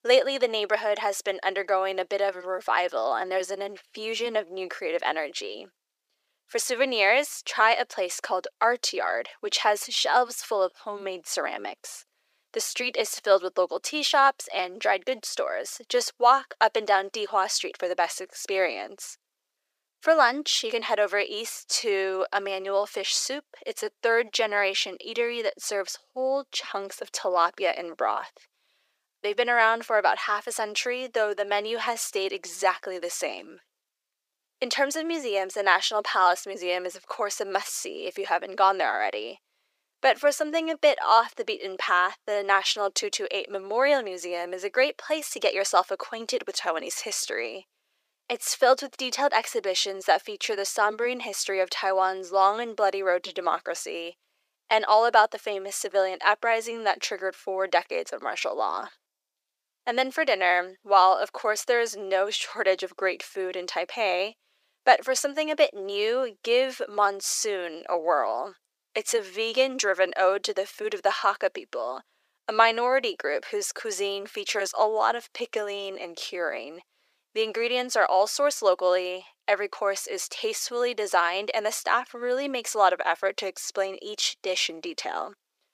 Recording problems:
thin; very; fading below 450 Hz

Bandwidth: 15 kHz